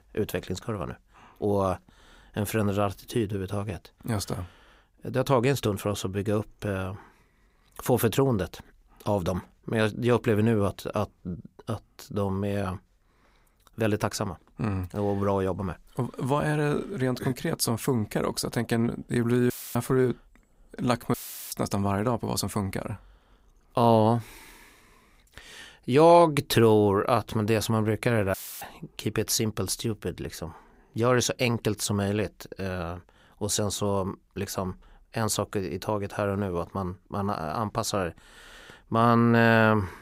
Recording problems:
audio cutting out; filled with static; at 20 s, at 21 s and at 28 s

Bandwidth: 15.5 kHz